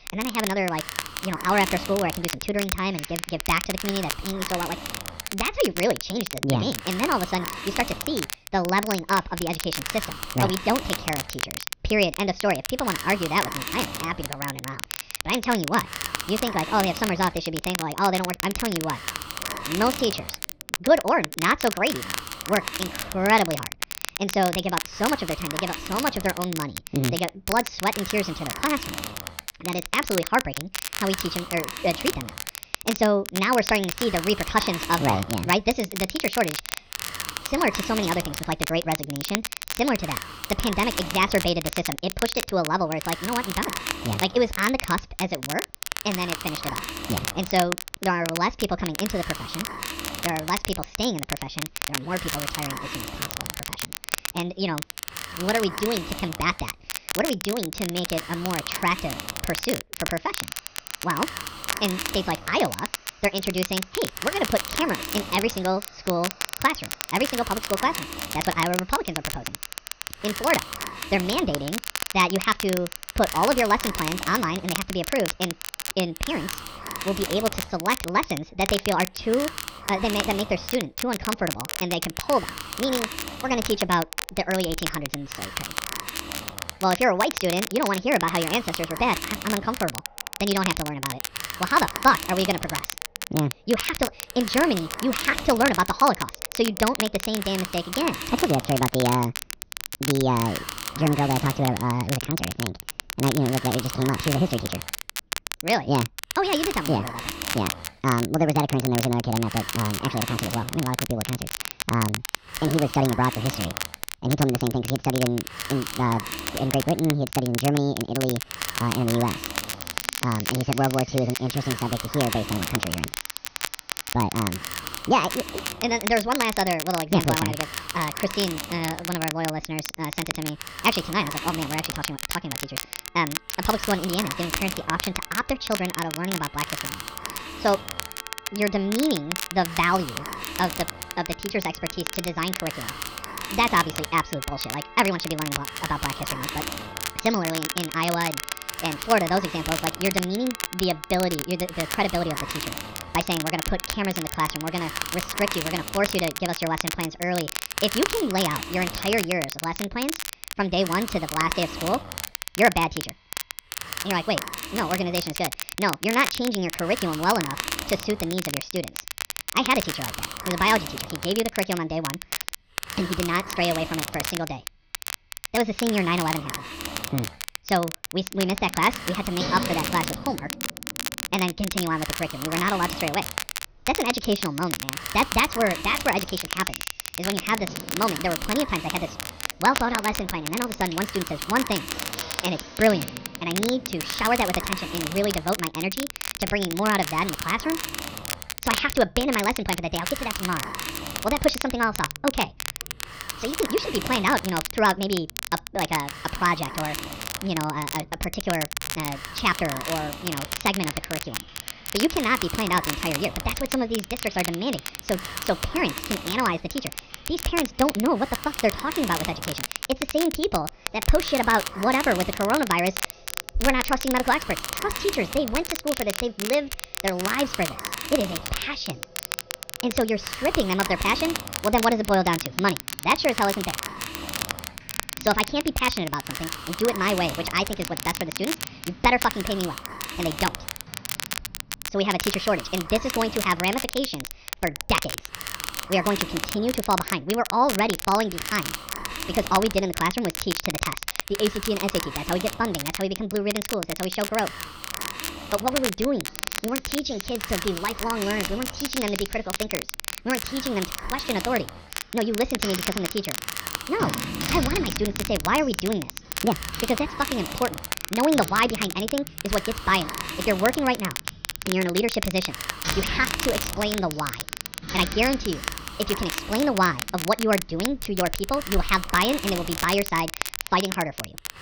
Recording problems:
wrong speed and pitch; too fast and too high; 1.5 times normal speed
high frequencies cut off; noticeable; nothing above 6.5 kHz
crackle, like an old record; loud; 6 dB below the speech
household noises; noticeable; throughout; 20 dB below the speech
hiss; noticeable; throughout; 10 dB below the speech

